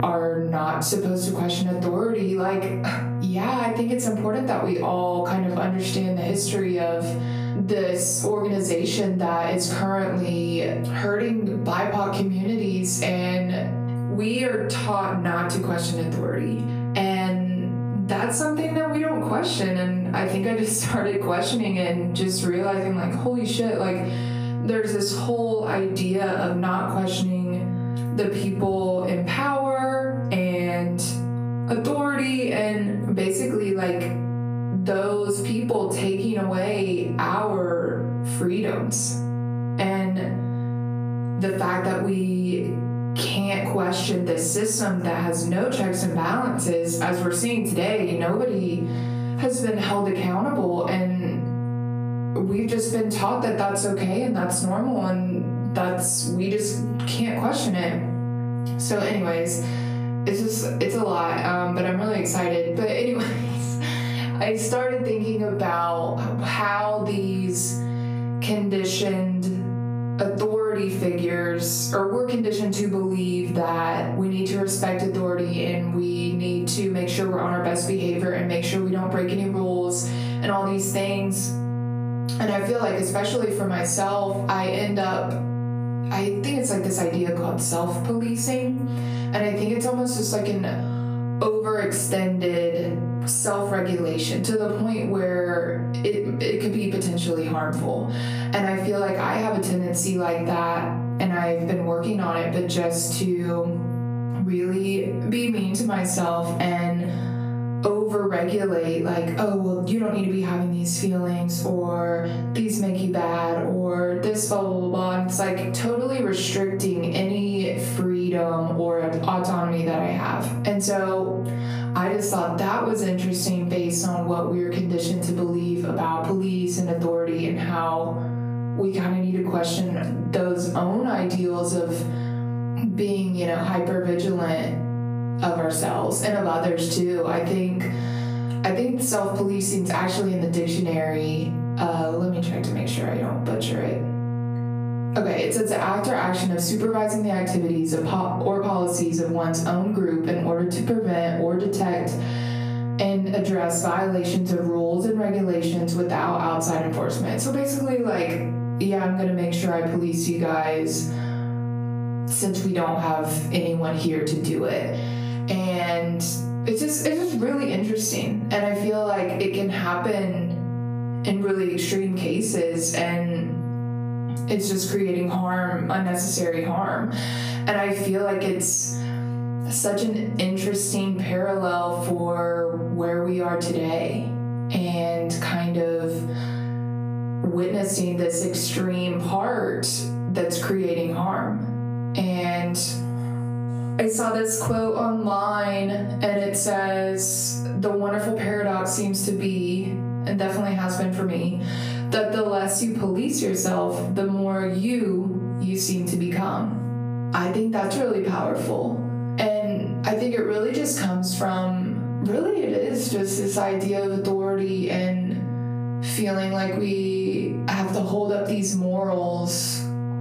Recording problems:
off-mic speech; far
squashed, flat; heavily
room echo; noticeable; dies away in 0.4 s
electrical hum; noticeable; throughout; 60 Hz, 15 dB below the speech

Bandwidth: 15 kHz